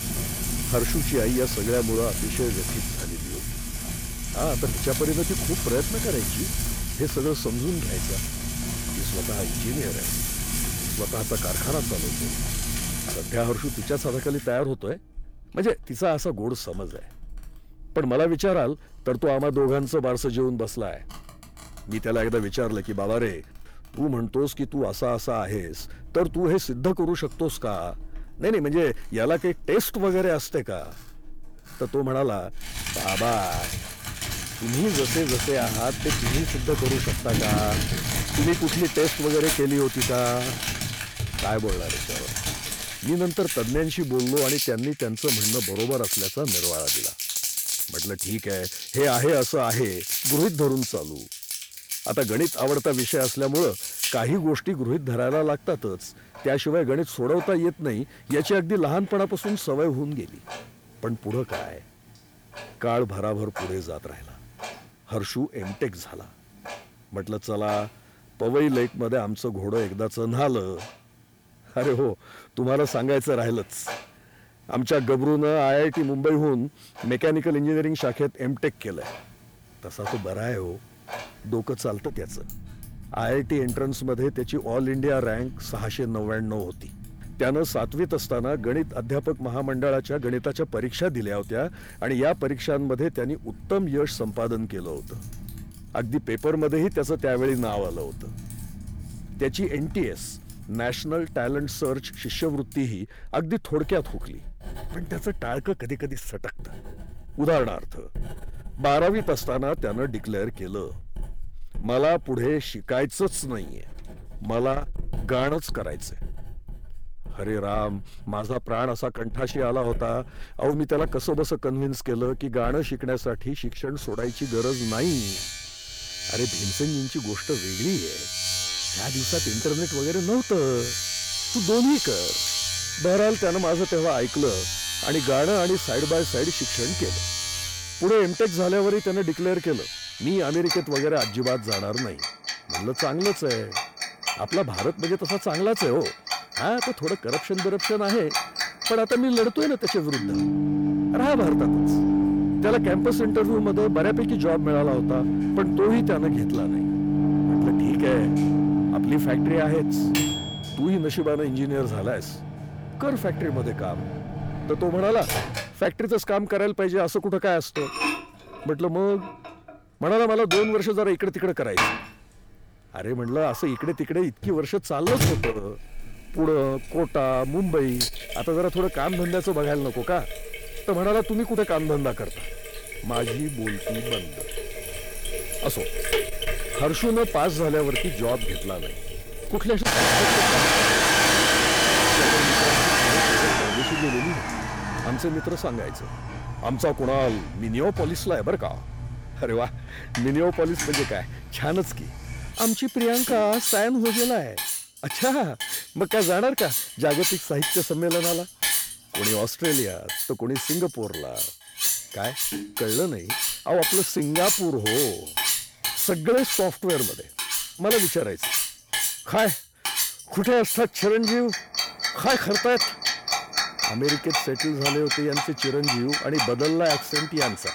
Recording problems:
distortion; slight; 10 dB below the speech
household noises; loud; throughout; 1 dB below the speech

